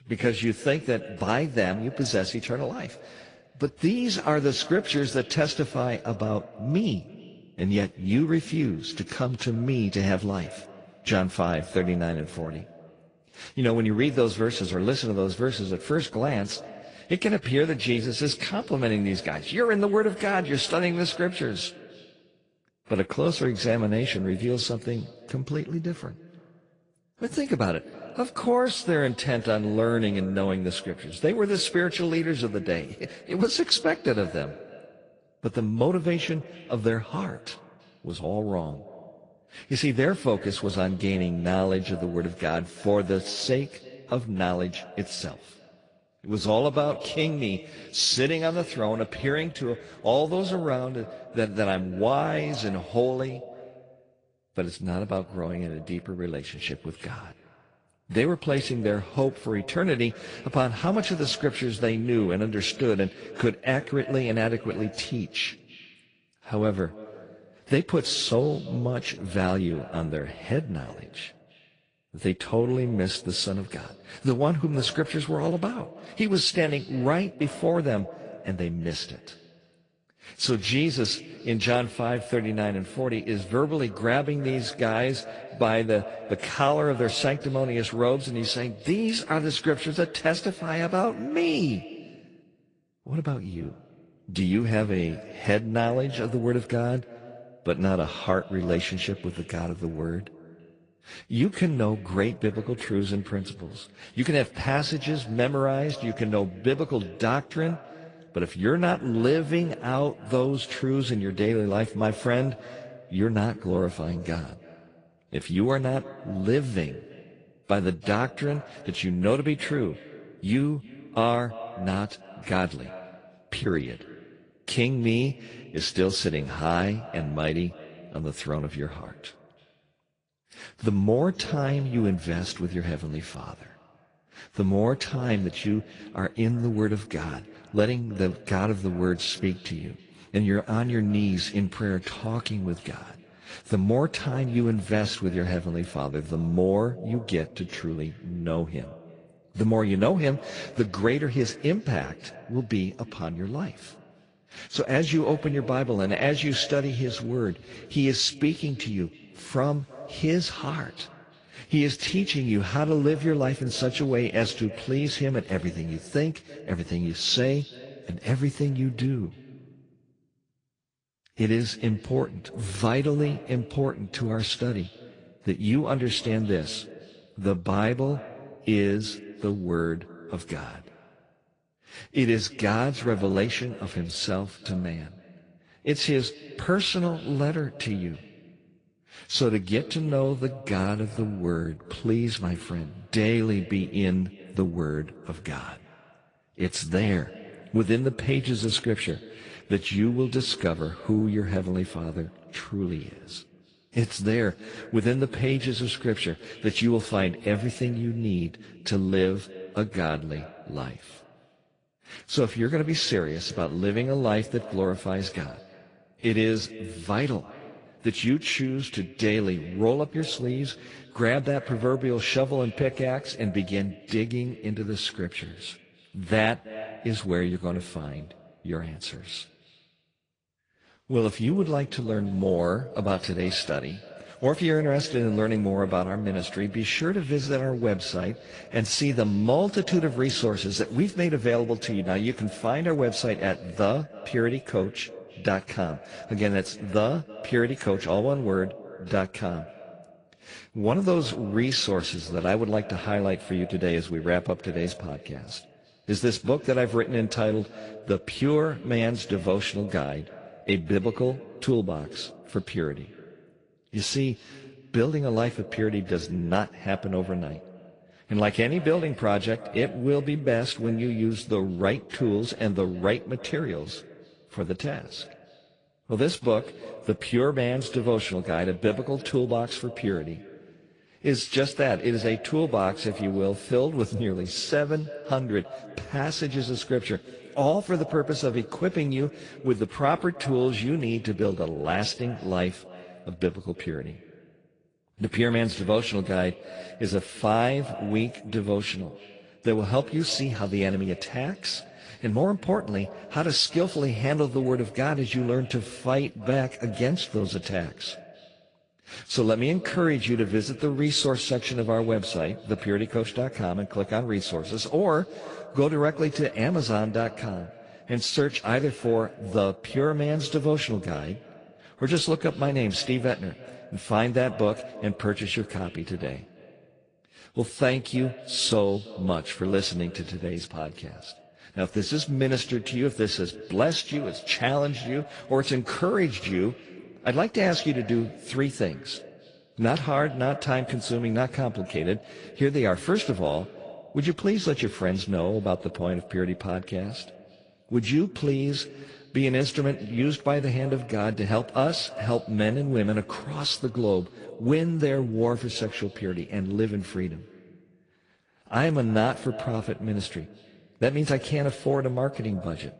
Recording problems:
echo of what is said; noticeable; throughout; 330 ms later, 20 dB below the speech
garbled, watery; slightly

